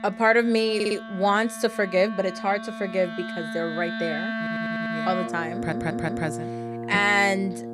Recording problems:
background music; loud; throughout; 8 dB below the speech
audio stuttering; at 1 s, at 4.5 s and at 5.5 s

